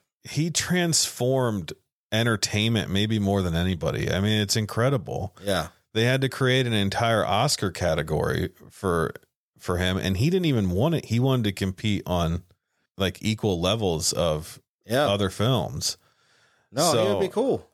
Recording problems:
none

